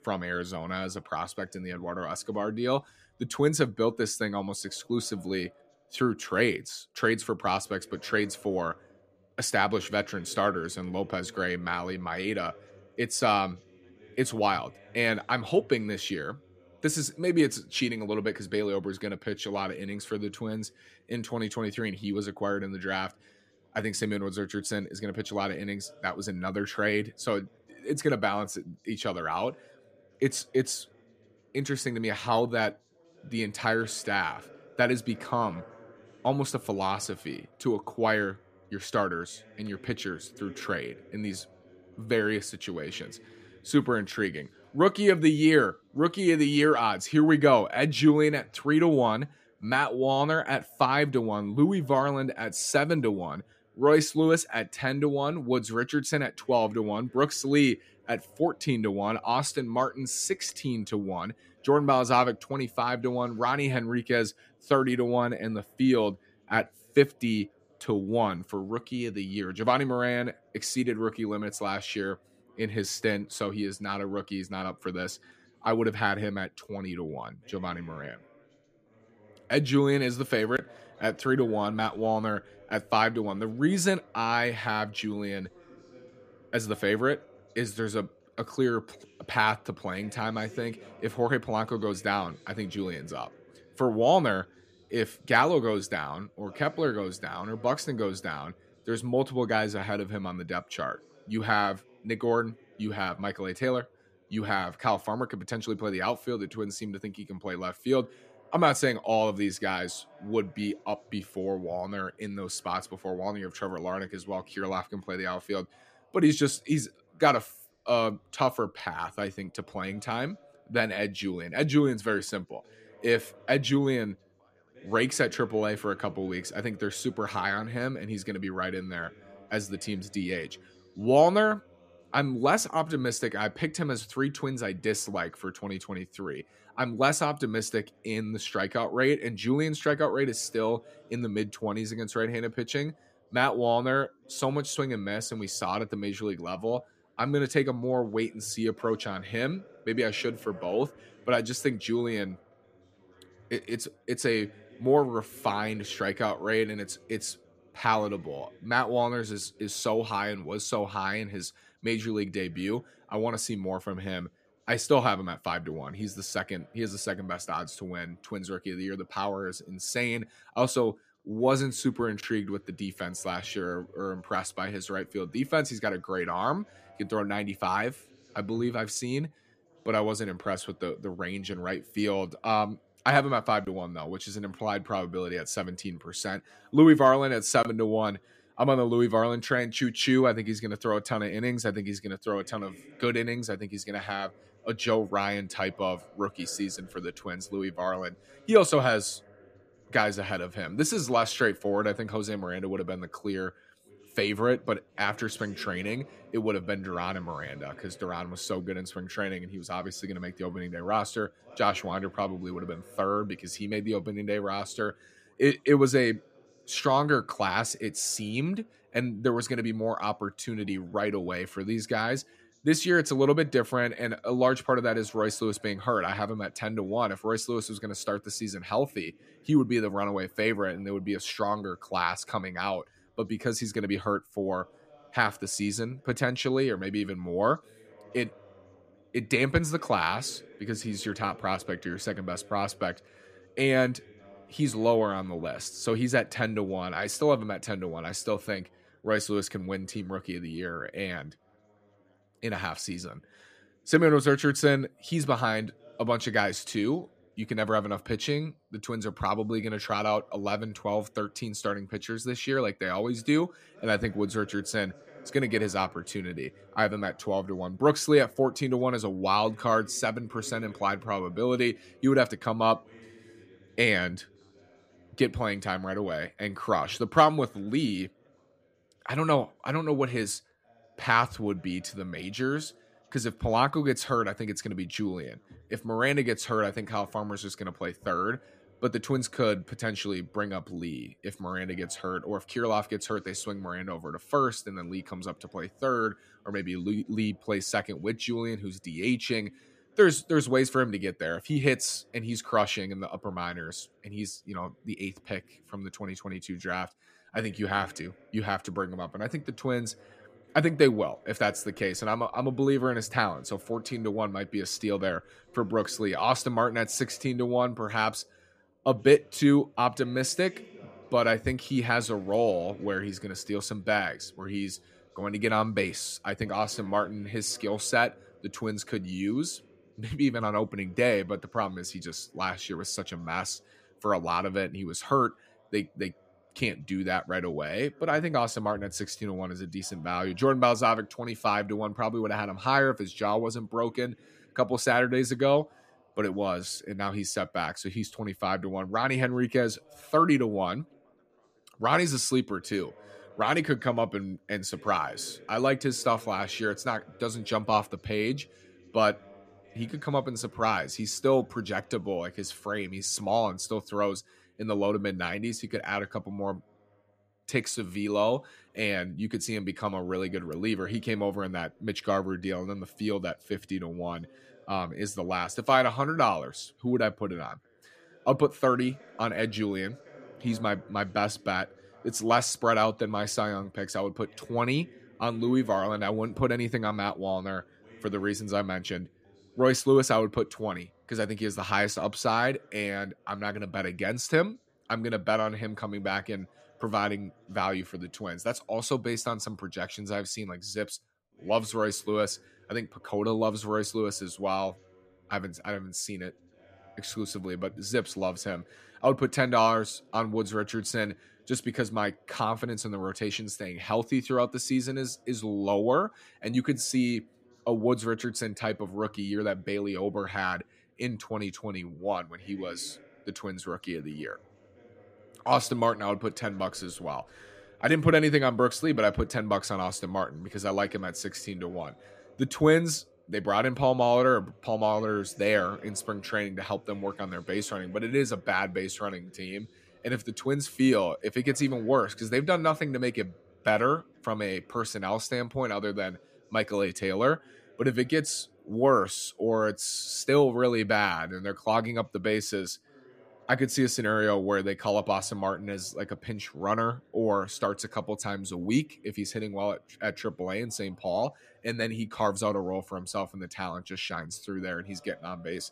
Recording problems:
background chatter; faint; throughout; 2 voices, 30 dB below the speech

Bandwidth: 14.5 kHz